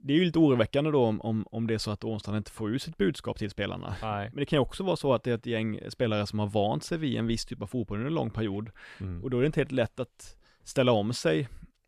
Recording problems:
none

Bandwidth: 14 kHz